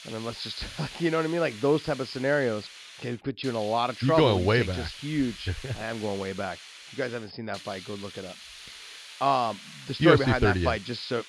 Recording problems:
high frequencies cut off; noticeable; nothing above 5.5 kHz
hiss; noticeable; throughout; 15 dB below the speech

